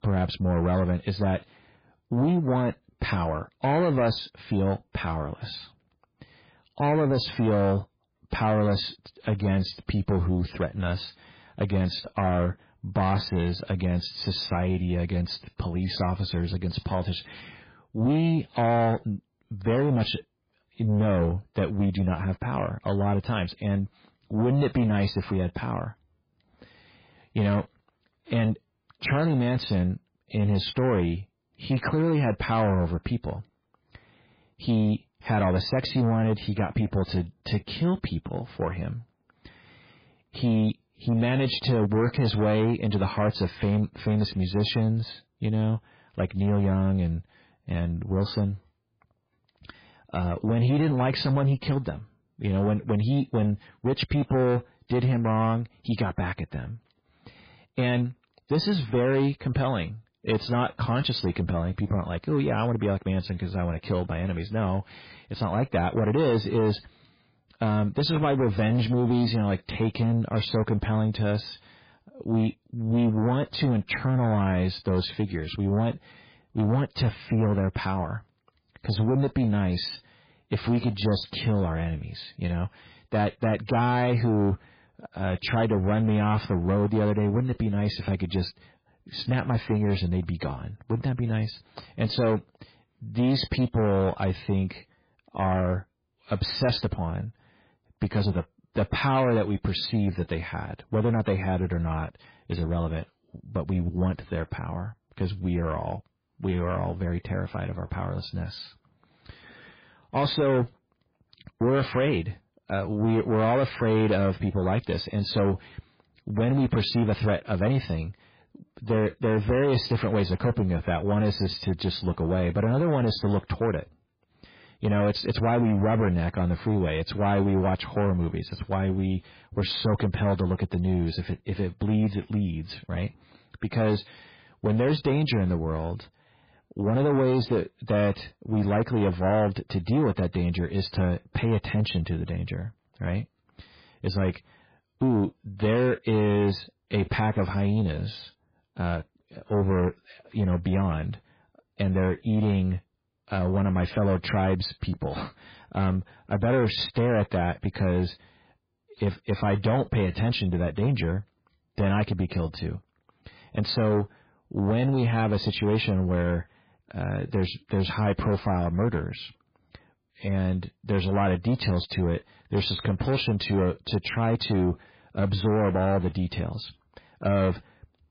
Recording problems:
garbled, watery; badly; nothing above 11 kHz
distortion; slight; 10 dB below the speech

